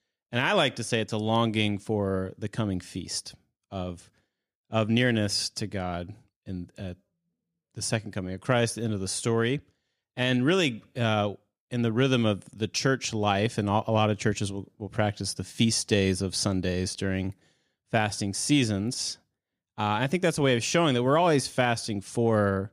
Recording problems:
none

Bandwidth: 14.5 kHz